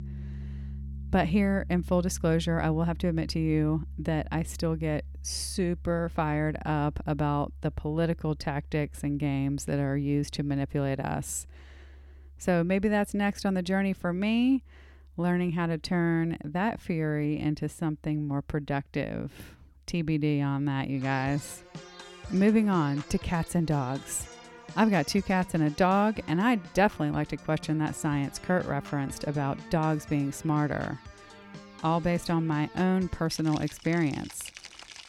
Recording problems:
background music; noticeable; throughout; 15 dB below the speech

